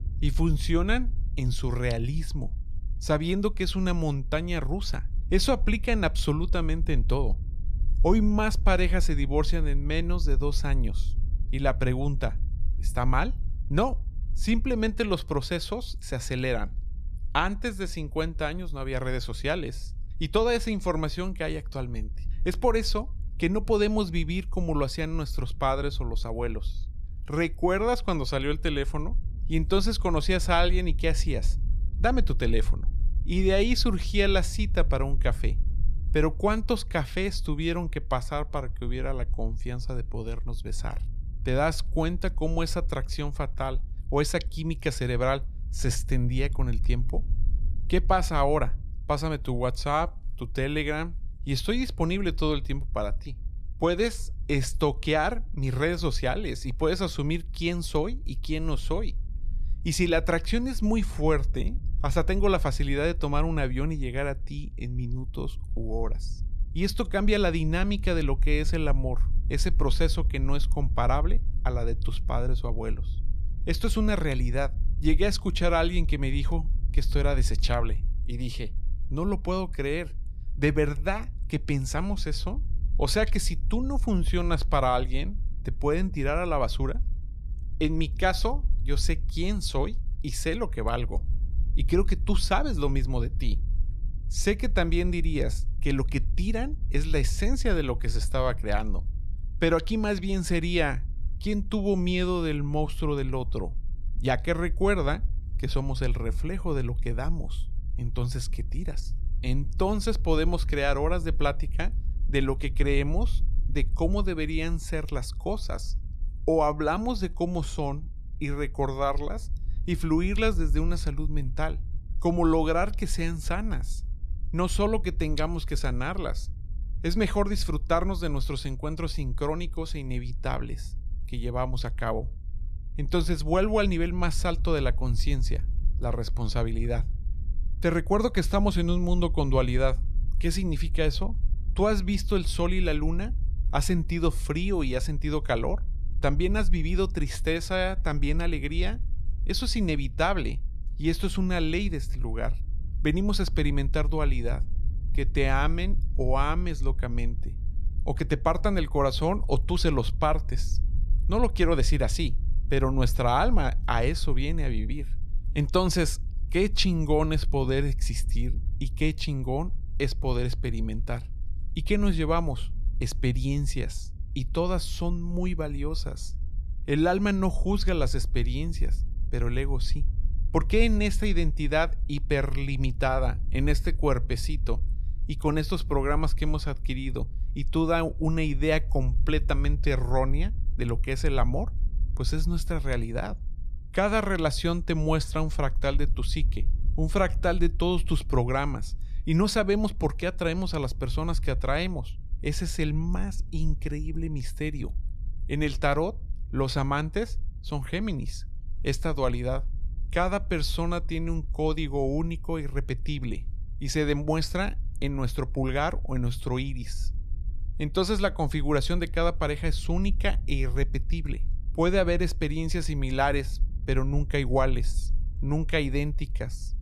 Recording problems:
low rumble; faint; throughout; 25 dB below the speech

